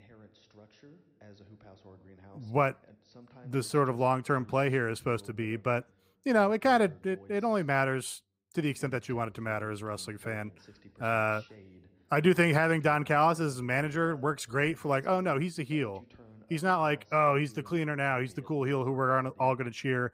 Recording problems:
voice in the background; faint; throughout; 25 dB below the speech

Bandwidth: 15.5 kHz